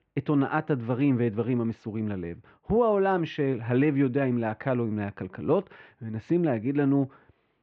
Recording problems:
muffled; very; fading above 3 kHz

